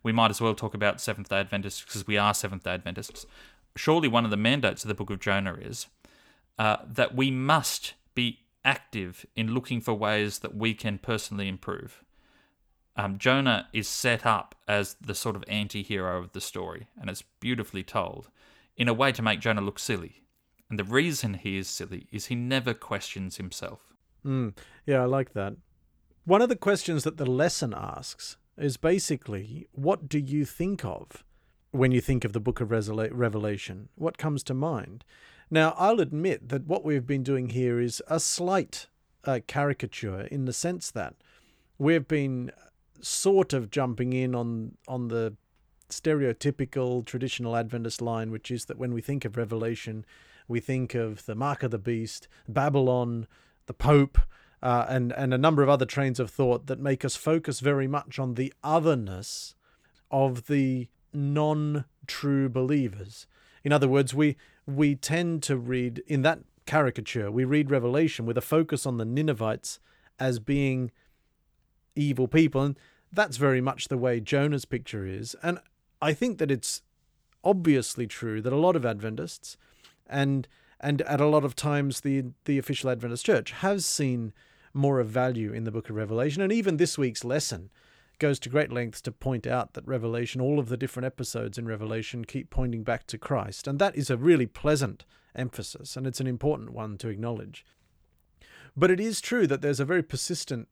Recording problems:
none

